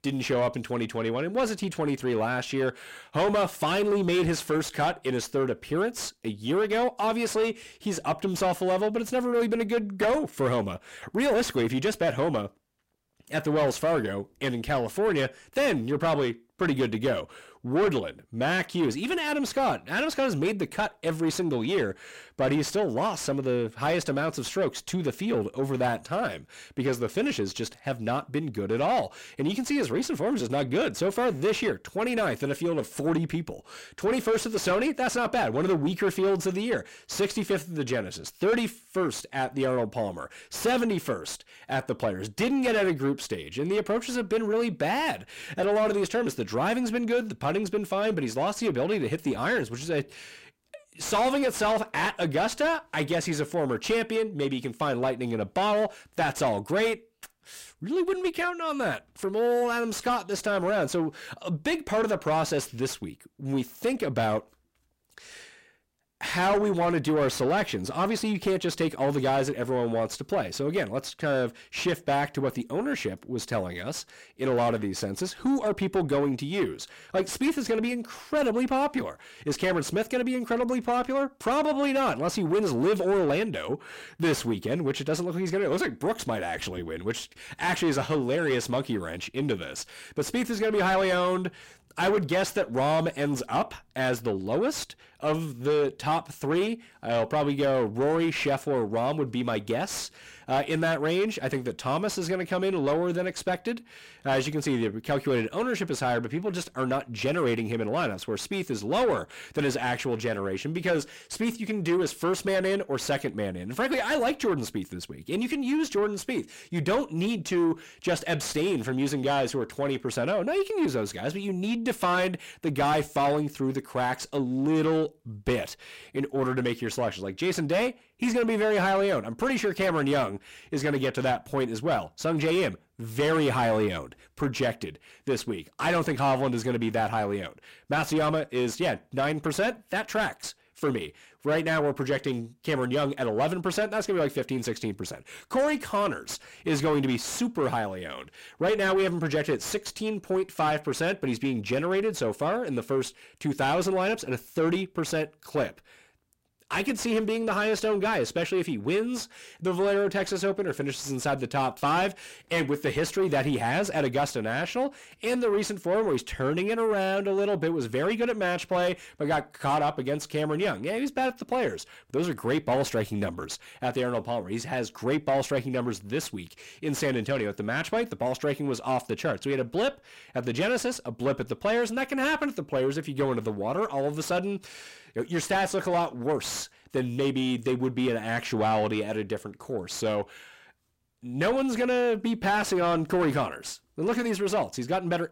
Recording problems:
distortion; heavy; 7 dB below the speech

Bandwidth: 16 kHz